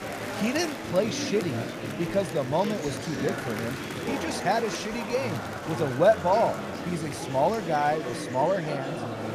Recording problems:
murmuring crowd; loud; throughout; 6 dB below the speech

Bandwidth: 14.5 kHz